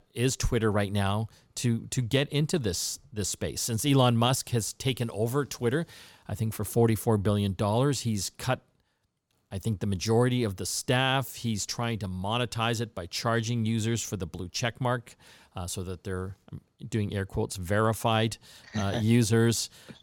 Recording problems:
none

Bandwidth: 17 kHz